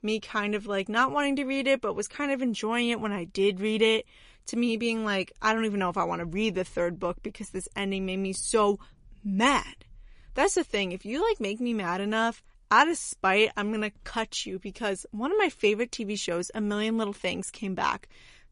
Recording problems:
garbled, watery; slightly; nothing above 10.5 kHz

